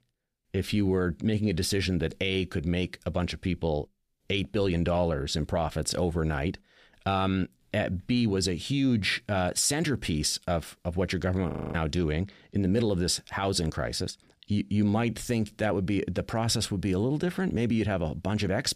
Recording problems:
audio freezing; at 12 s

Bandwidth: 15 kHz